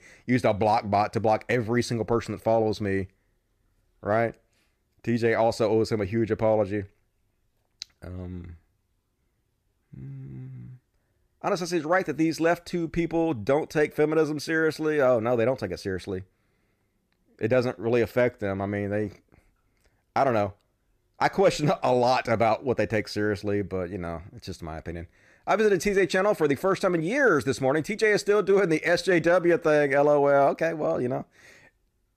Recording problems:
none

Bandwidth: 14.5 kHz